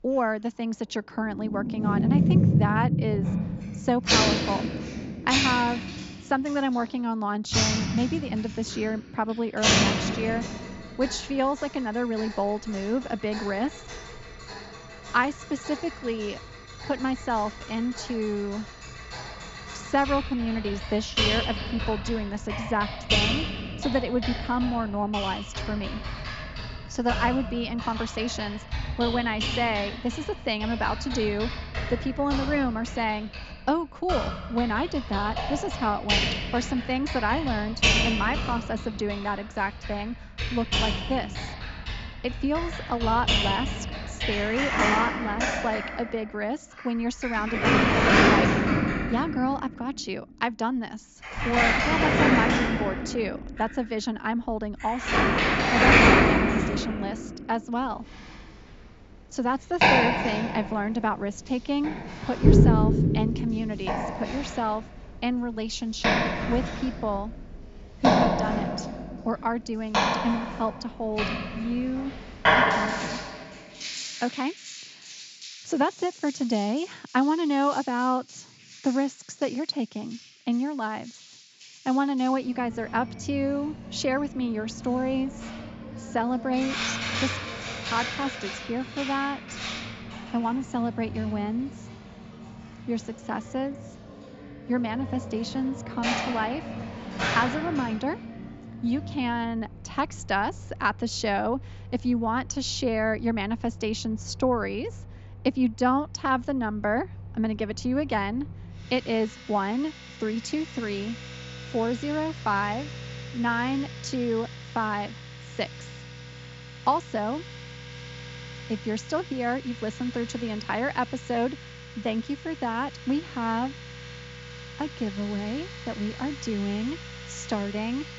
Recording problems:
high frequencies cut off; noticeable; nothing above 7.5 kHz
household noises; very loud; throughout; 2 dB above the speech

